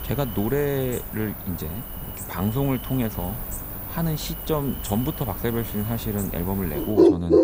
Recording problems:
animal sounds; loud; throughout; 1 dB below the speech

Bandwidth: 15.5 kHz